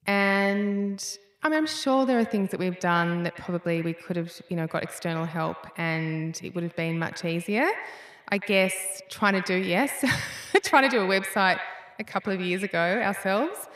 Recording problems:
echo of what is said; strong; throughout; 100 ms later, 10 dB below the speech

